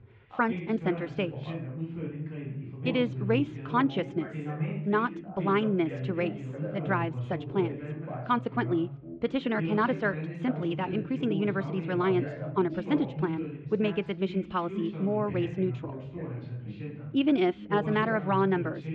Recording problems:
muffled; very; fading above 3 kHz
wrong speed, natural pitch; too fast; 1.5 times normal speed
background chatter; loud; throughout; 2 voices, 7 dB below the speech

